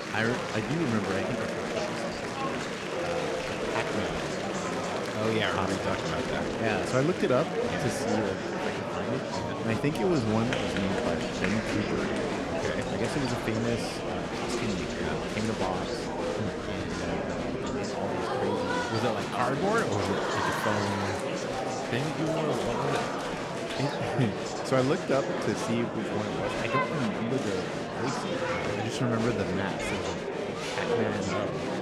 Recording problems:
murmuring crowd; very loud; throughout; 1 dB above the speech

